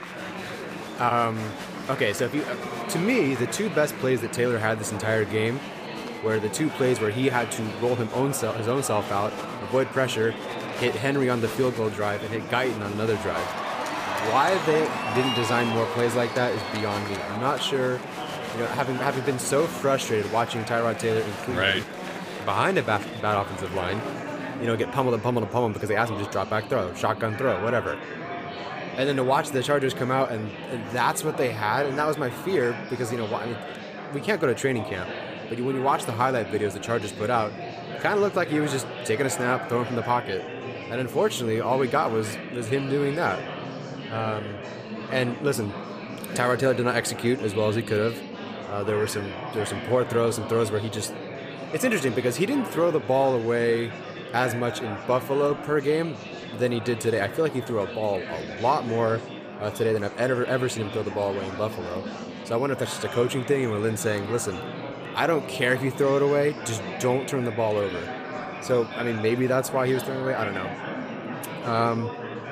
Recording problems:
murmuring crowd; loud; throughout; 8 dB below the speech

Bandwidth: 15 kHz